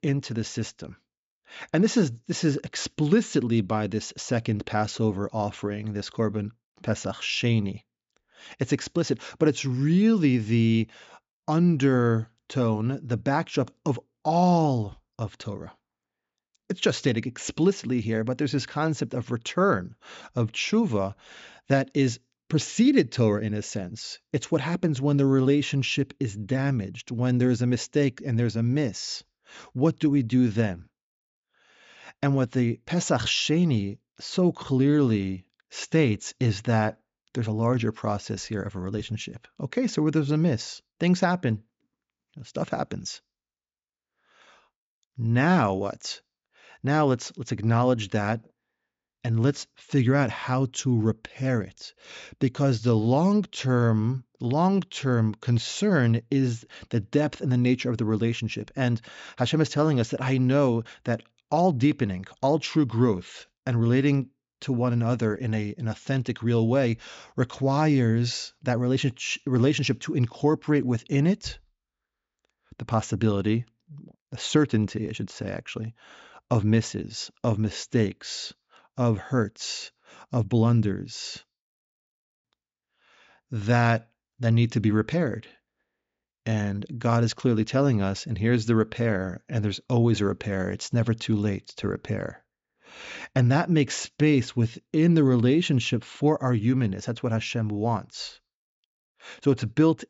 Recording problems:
high frequencies cut off; noticeable; nothing above 7.5 kHz

